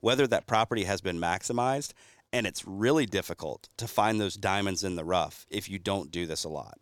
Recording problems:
none

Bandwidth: 17.5 kHz